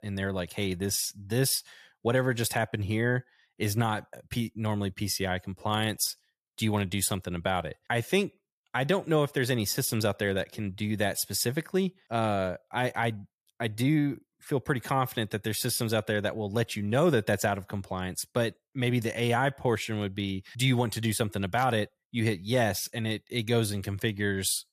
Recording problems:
none

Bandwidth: 14.5 kHz